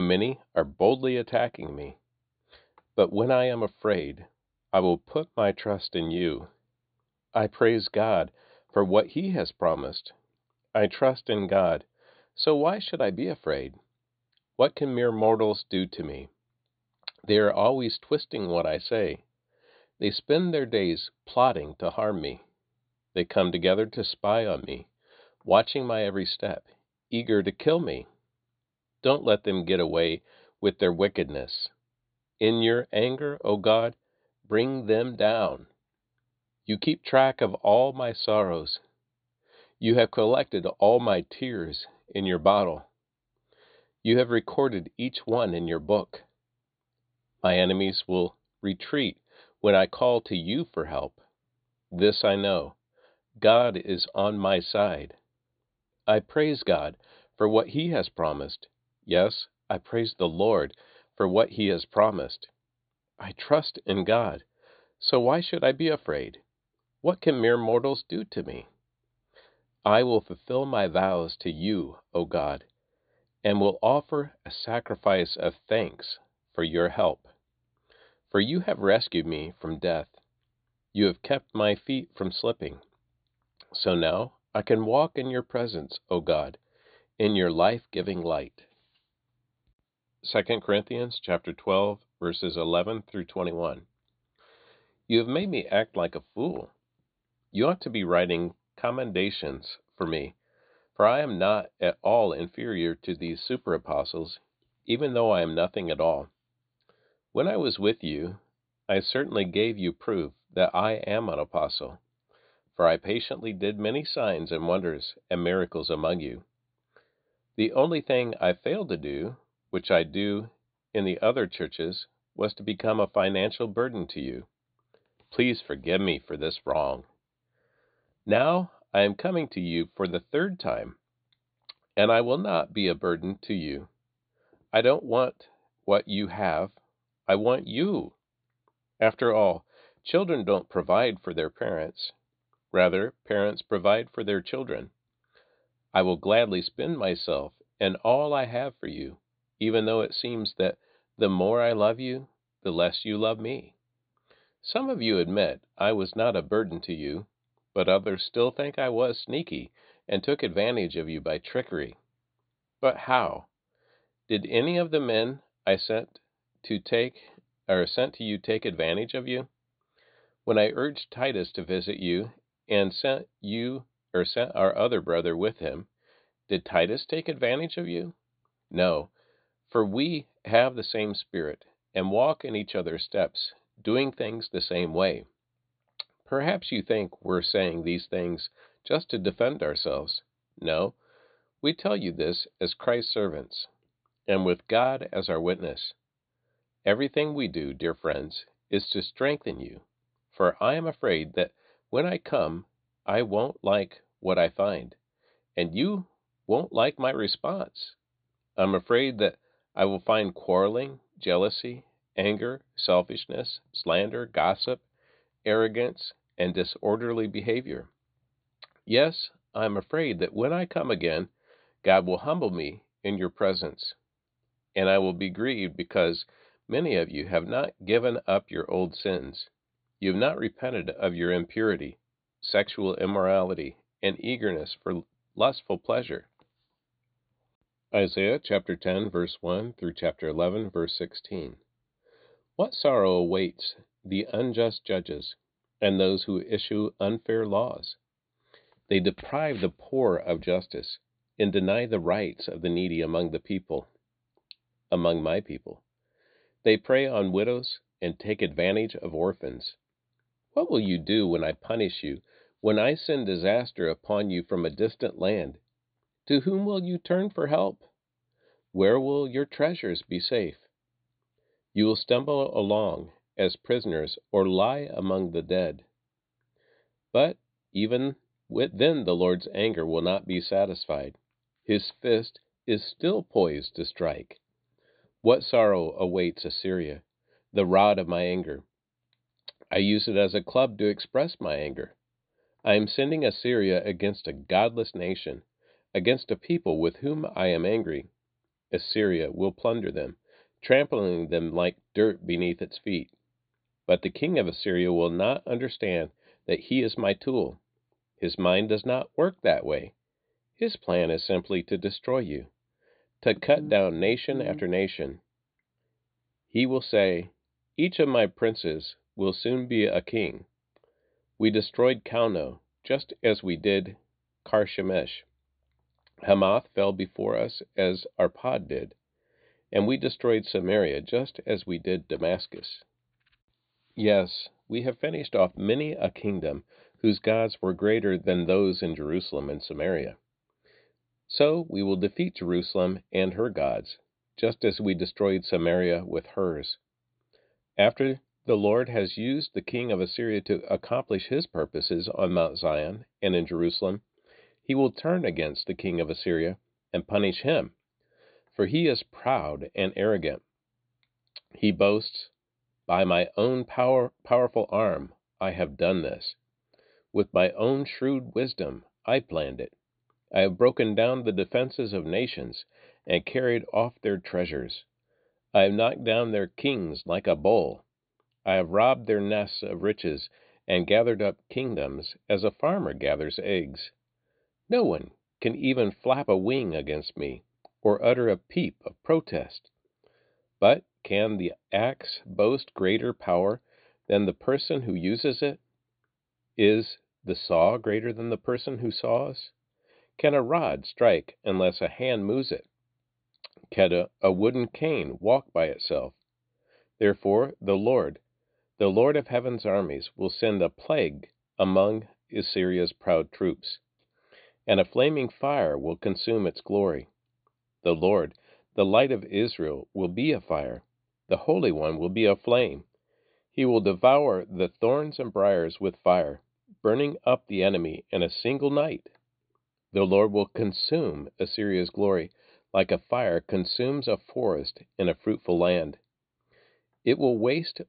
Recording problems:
high frequencies cut off; severe; nothing above 4.5 kHz
abrupt cut into speech; at the start

